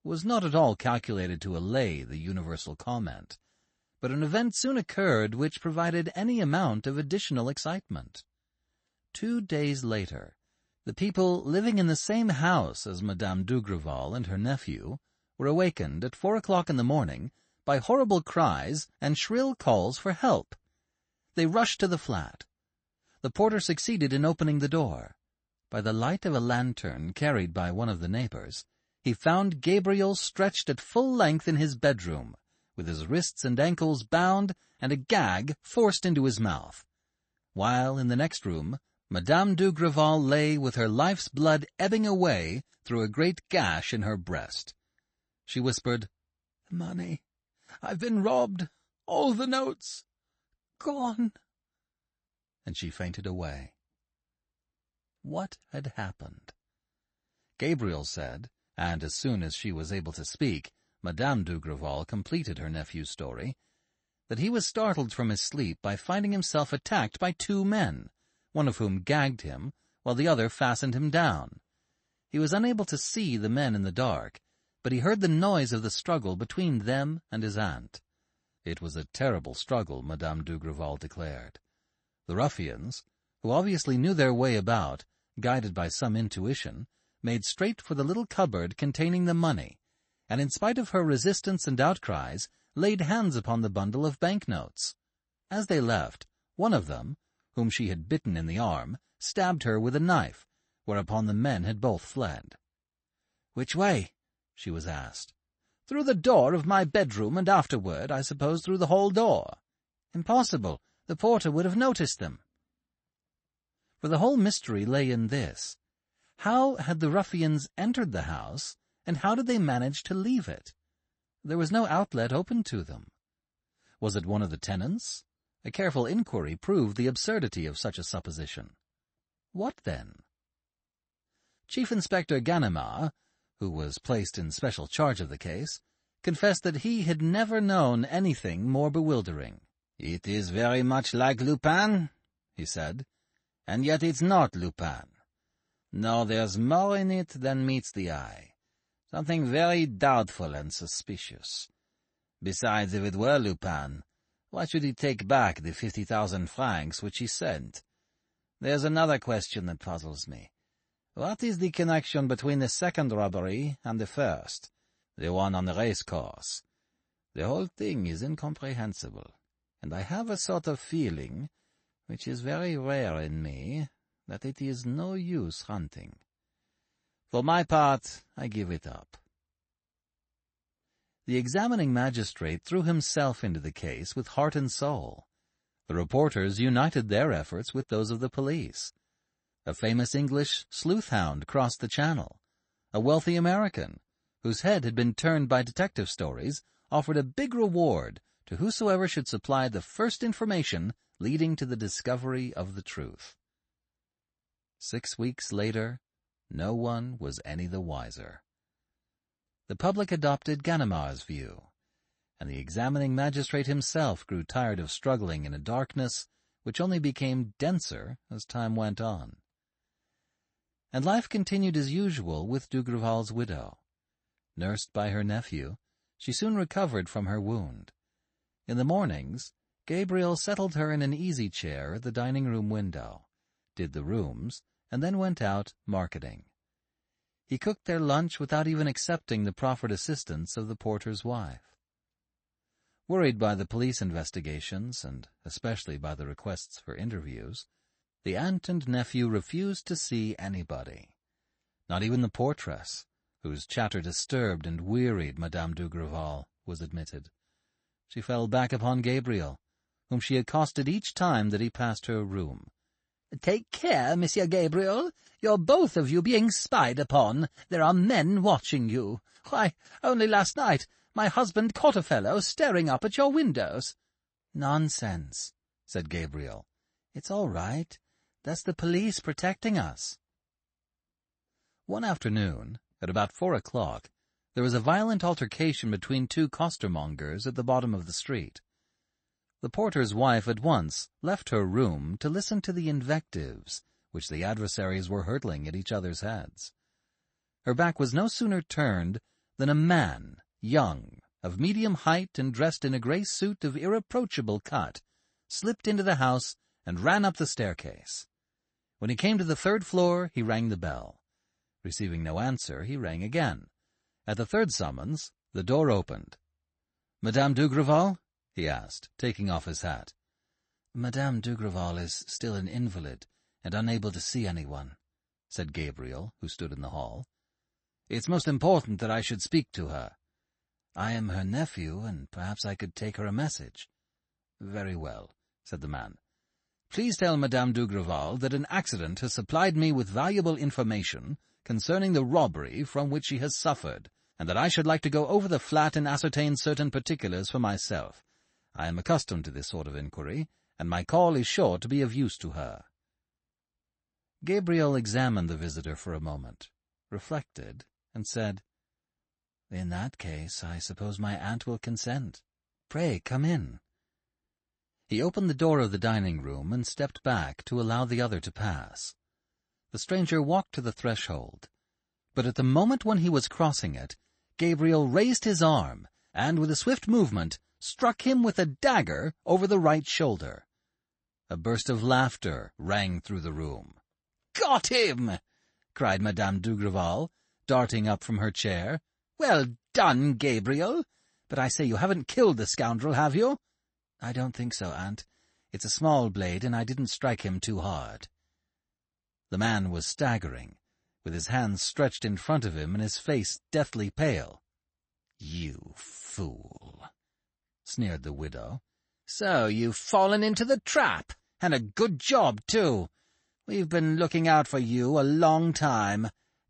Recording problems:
garbled, watery; slightly; nothing above 8 kHz

